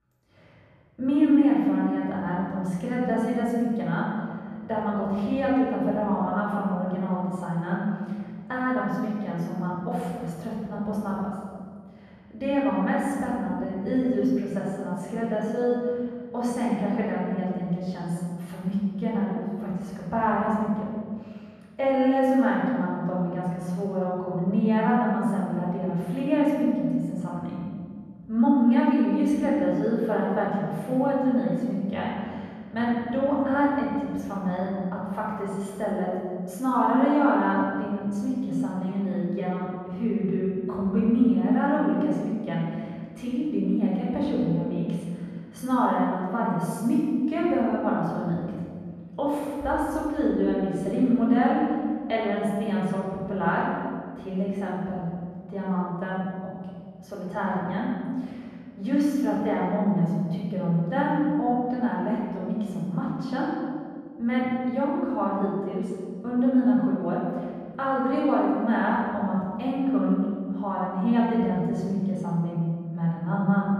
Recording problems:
room echo; strong; dies away in 1.7 s
off-mic speech; far
muffled; slightly; fading above 3 kHz

